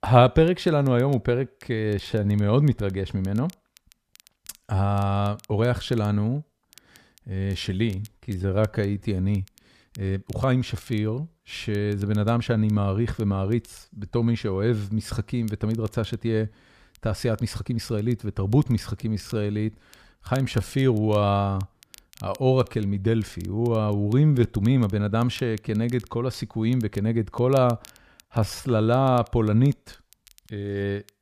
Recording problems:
crackle, like an old record; faint; 30 dB below the speech
uneven, jittery; strongly; from 2 to 29 s

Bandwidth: 14.5 kHz